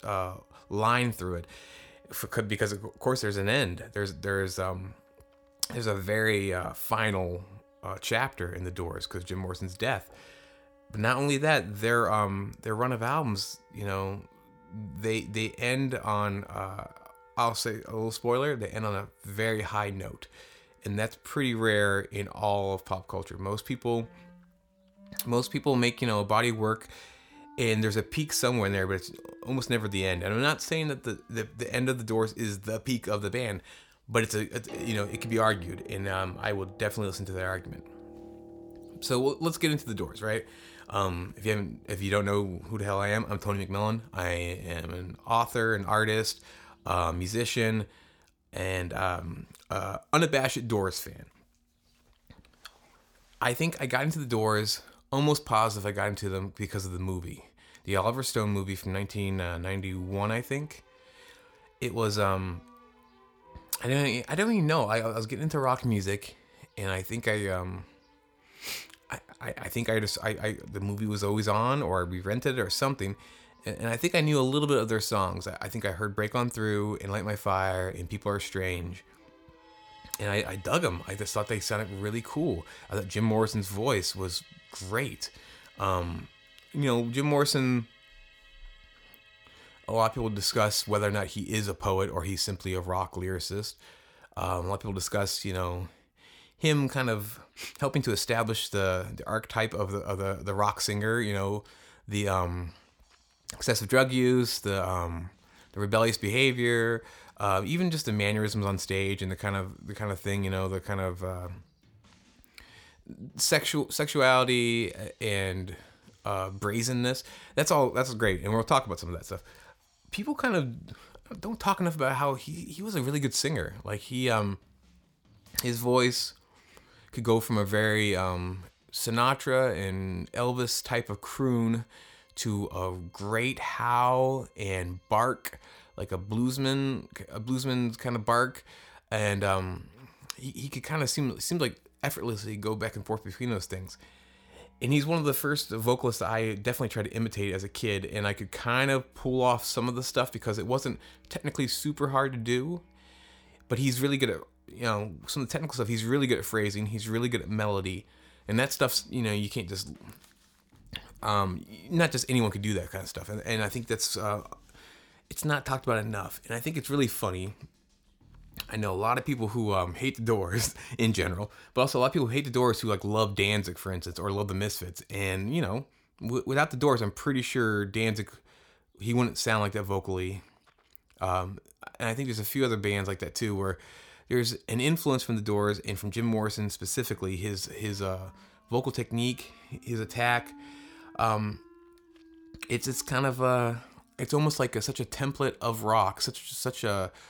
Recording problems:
background music; faint; throughout; 30 dB below the speech

